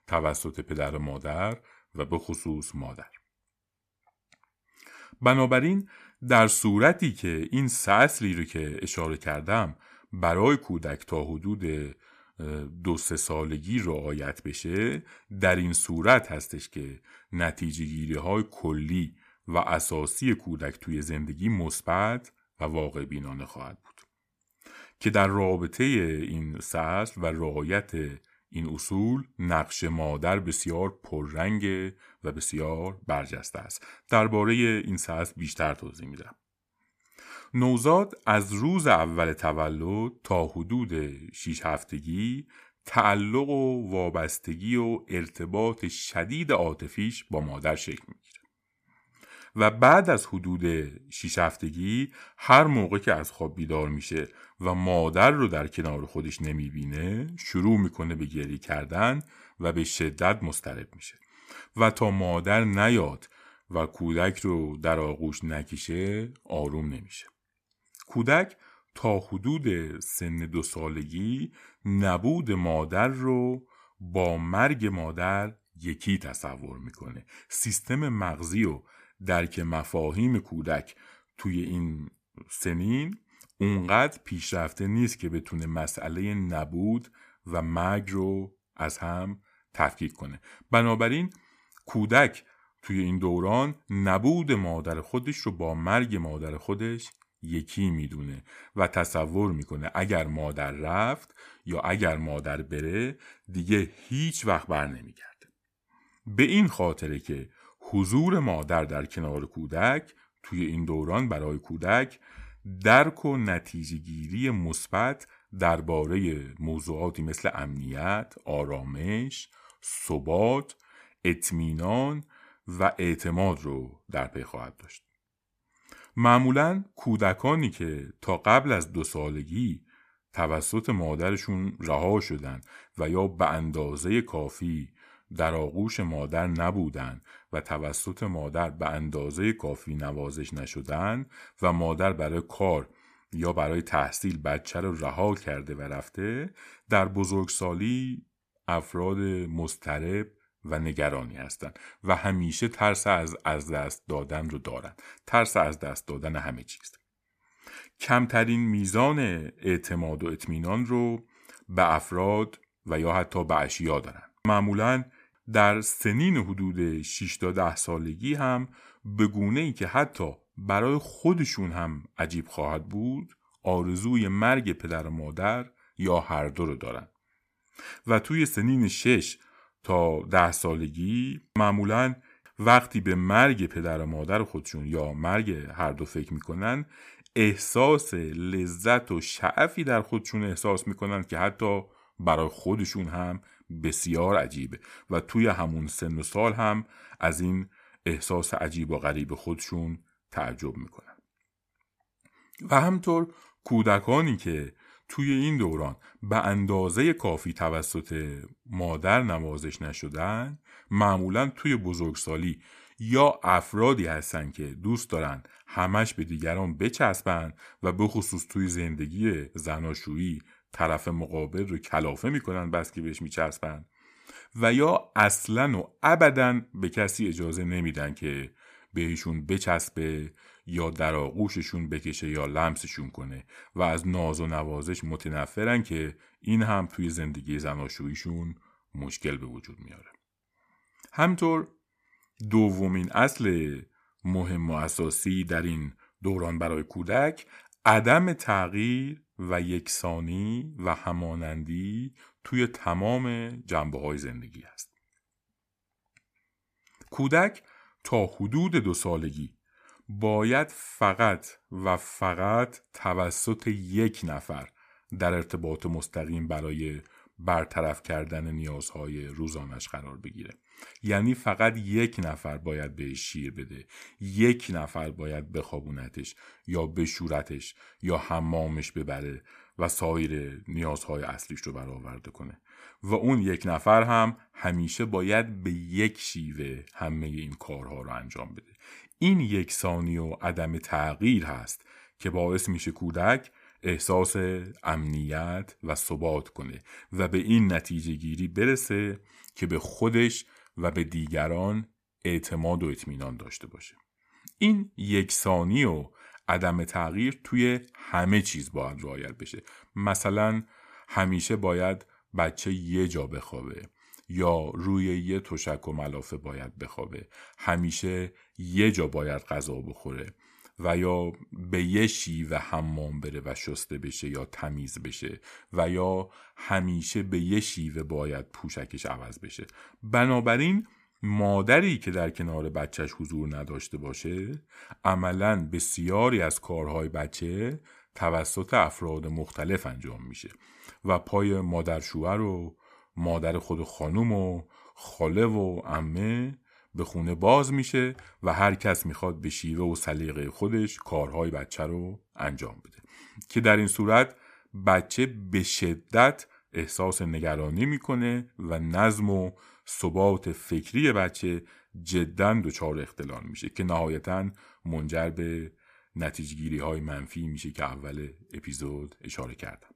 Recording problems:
none

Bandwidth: 15 kHz